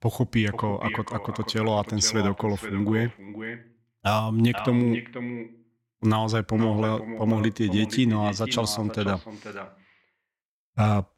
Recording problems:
echo of what is said; strong; throughout; 480 ms later, 10 dB below the speech

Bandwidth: 16.5 kHz